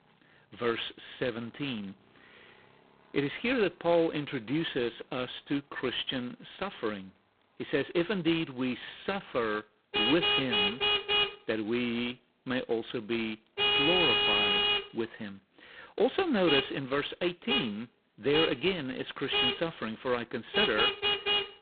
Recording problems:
phone-call audio; poor line; nothing above 4 kHz
traffic noise; very loud; throughout; 5 dB above the speech

